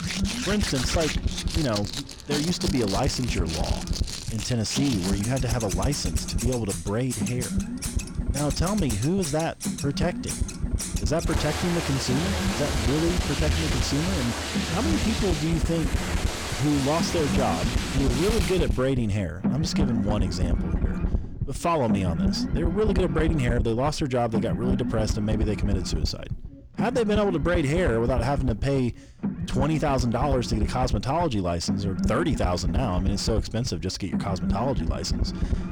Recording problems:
distortion; heavy; 6 dB below the speech
household noises; loud; until 19 s; 4 dB below the speech
low rumble; loud; throughout; 9 dB below the speech

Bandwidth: 18 kHz